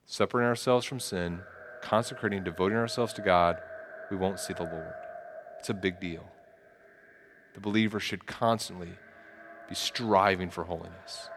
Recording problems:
echo of what is said; noticeable; throughout; 300 ms later, 15 dB below the speech

